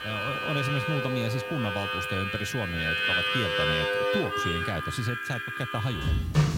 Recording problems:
background music; very loud; throughout; 4 dB above the speech
train or aircraft noise; noticeable; until 4 s; 15 dB below the speech
high-pitched whine; faint; throughout; 3 kHz, 35 dB below the speech
hiss; faint; throughout; 25 dB below the speech

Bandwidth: 16 kHz